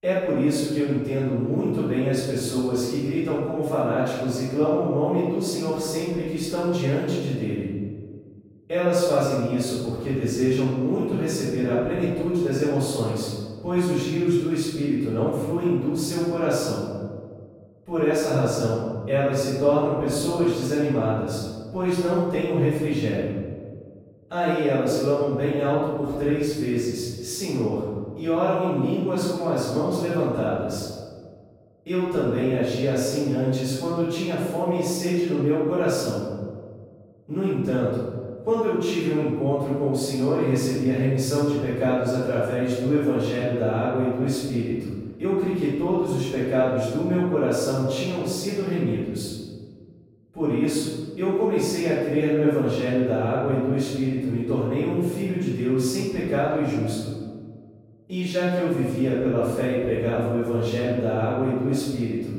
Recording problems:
room echo; strong; dies away in 1.5 s
off-mic speech; far

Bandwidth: 16 kHz